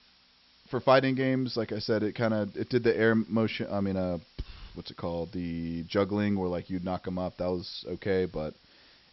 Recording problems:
high frequencies cut off; noticeable; nothing above 5.5 kHz
hiss; faint; throughout; 30 dB below the speech

